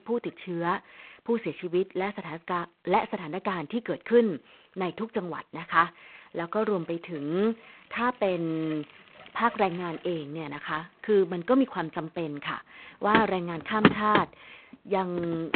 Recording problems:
phone-call audio; poor line; nothing above 4 kHz
traffic noise; loud; throughout; as loud as the speech

